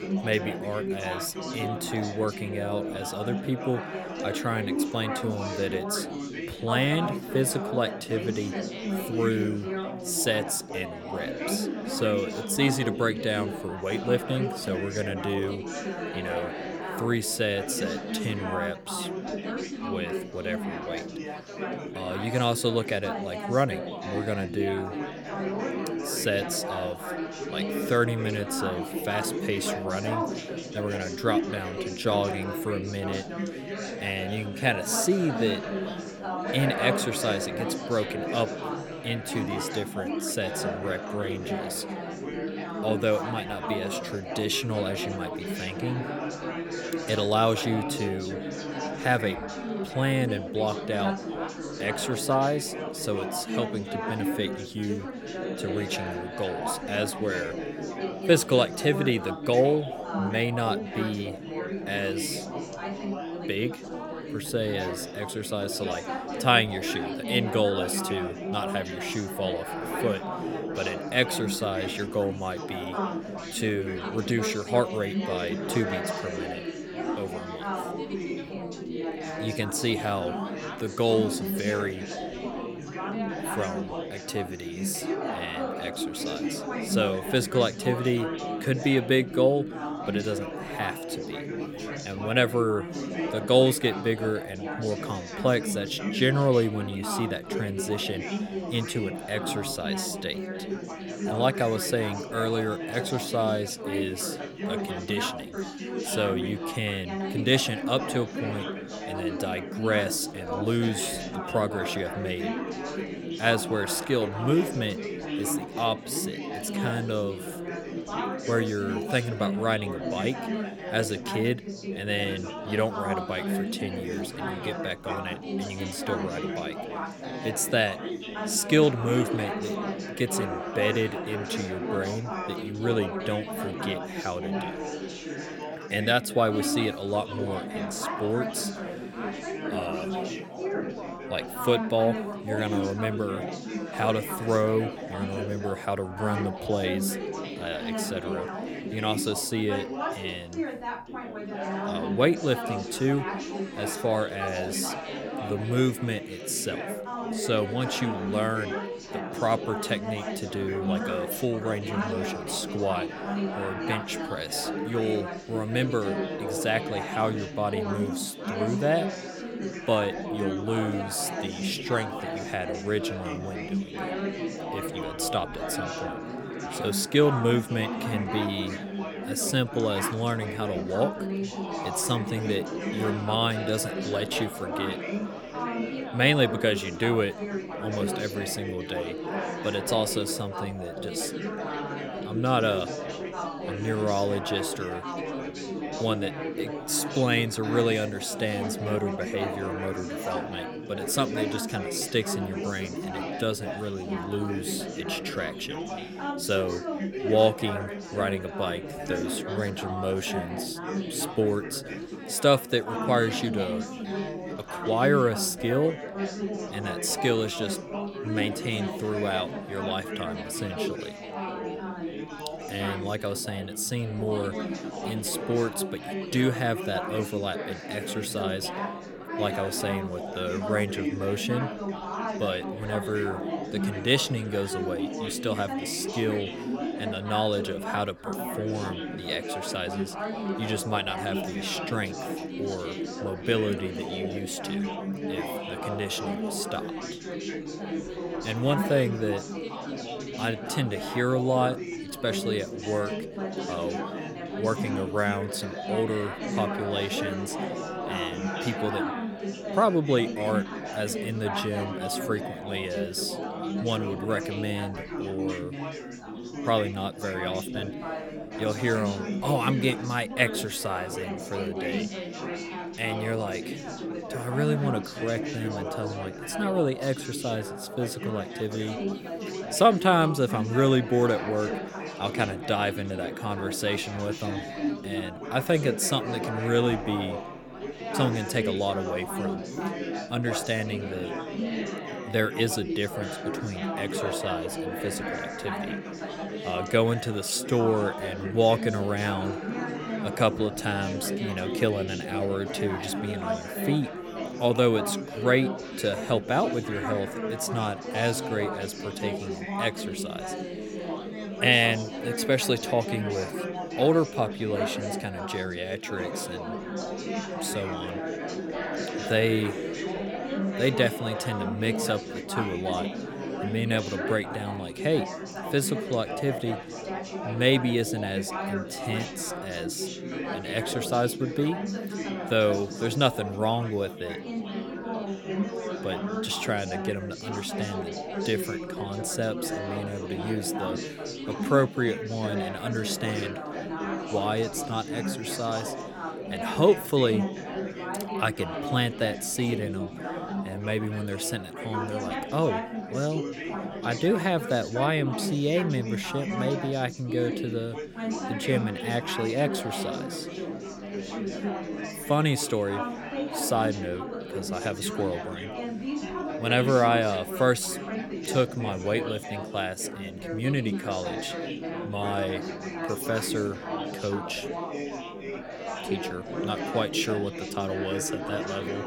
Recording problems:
chatter from many people; loud; throughout; 4 dB below the speech

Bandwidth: 18 kHz